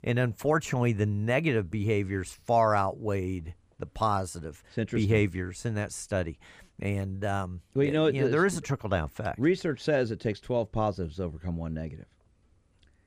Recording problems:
none

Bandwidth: 15 kHz